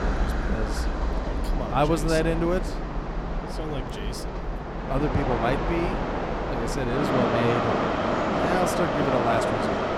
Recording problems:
train or aircraft noise; very loud; throughout; 1 dB above the speech

